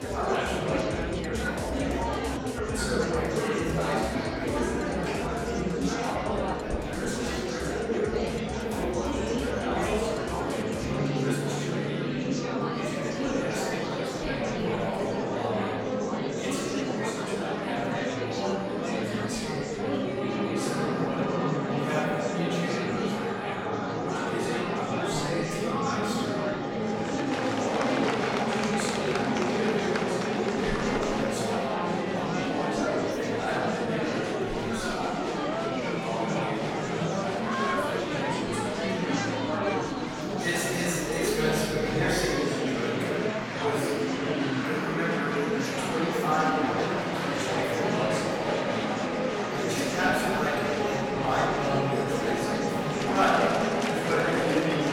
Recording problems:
room echo; strong; dies away in 2.2 s
off-mic speech; far
murmuring crowd; very loud; throughout; 3 dB above the speech
background music; loud; throughout; 4 dB below the speech

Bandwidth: 17 kHz